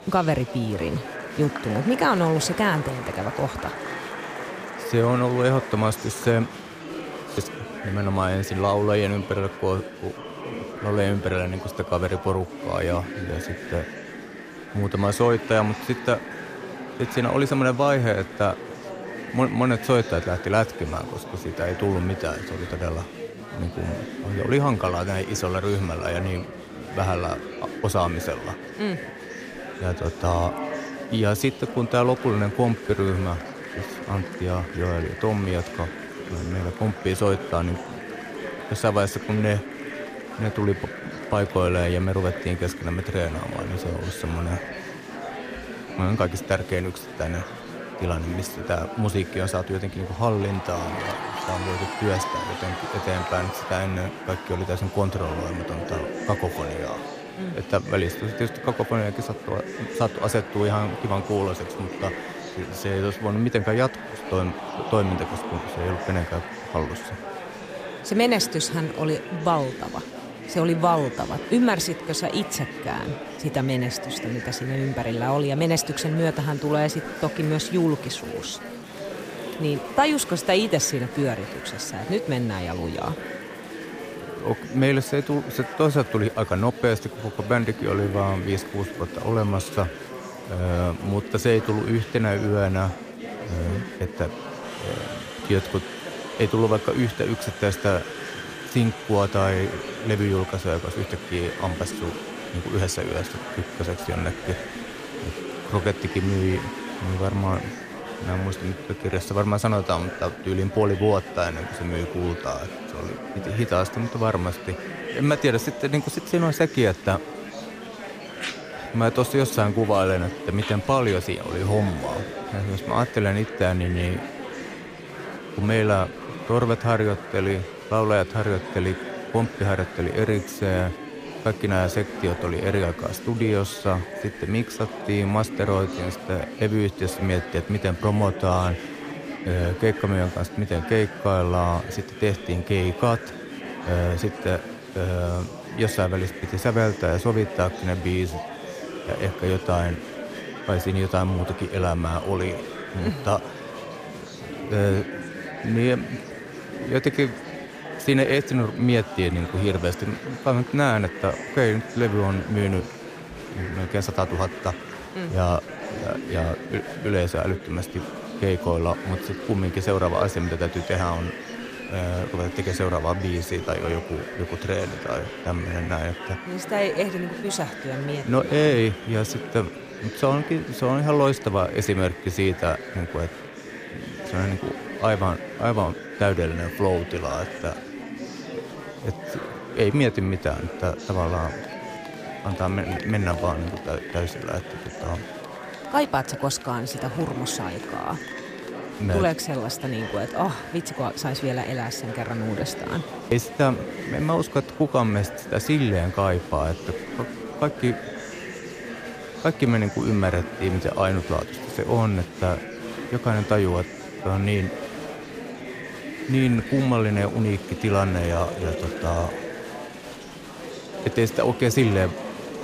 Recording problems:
murmuring crowd; loud; throughout; 9 dB below the speech

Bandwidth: 15 kHz